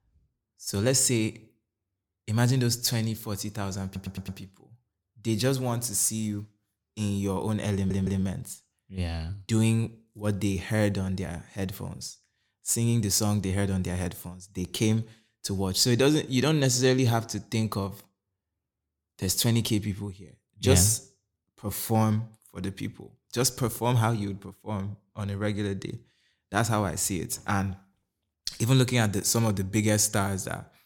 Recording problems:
audio stuttering; at 4 s and at 7.5 s

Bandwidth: 17.5 kHz